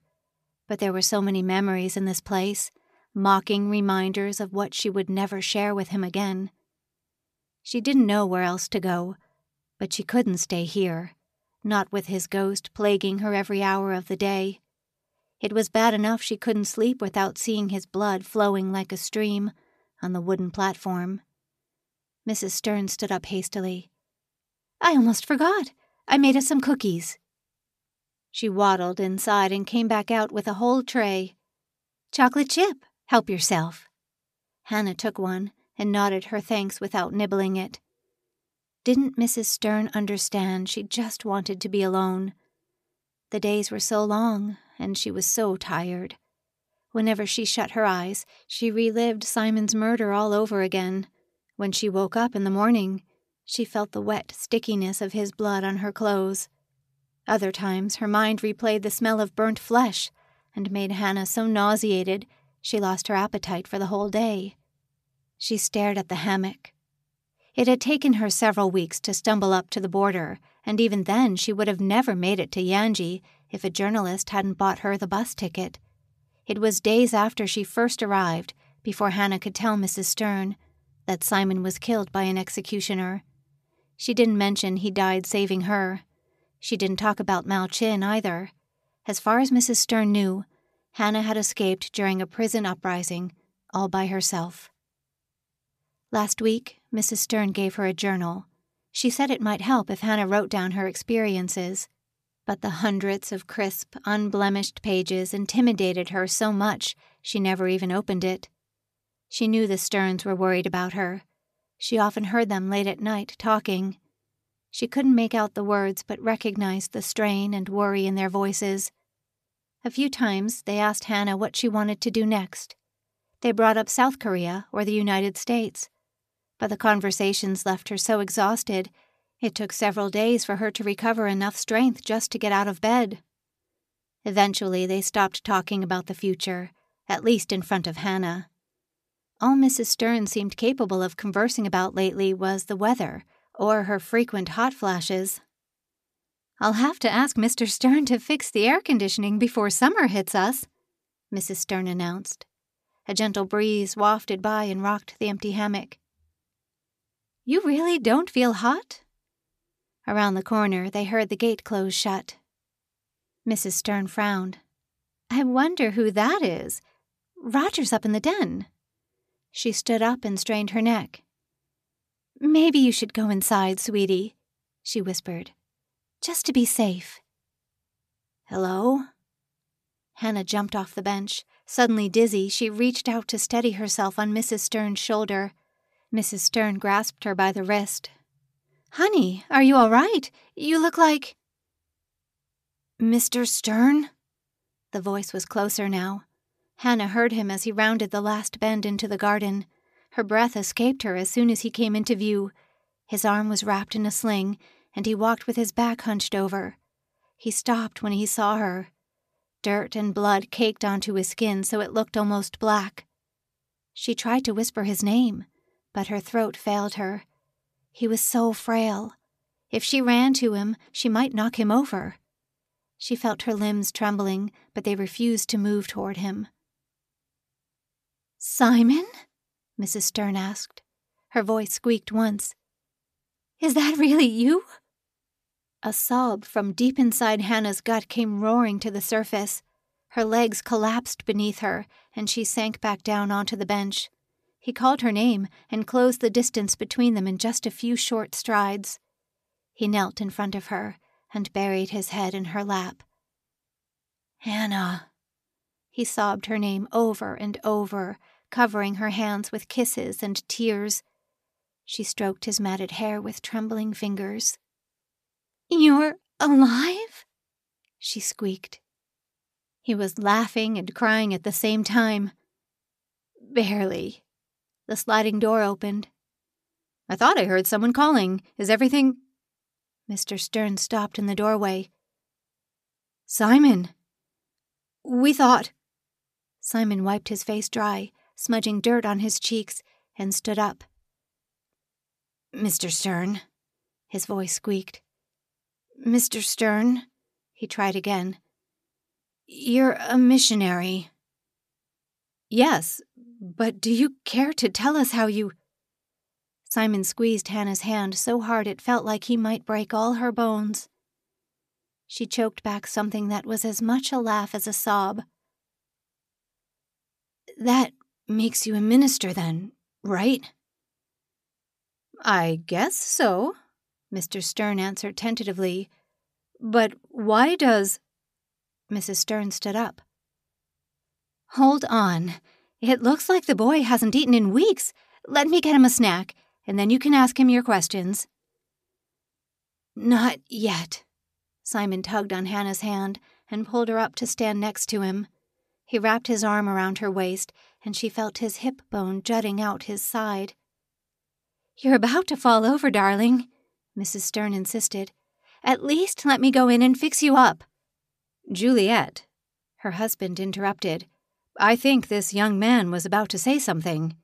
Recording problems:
none

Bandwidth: 14.5 kHz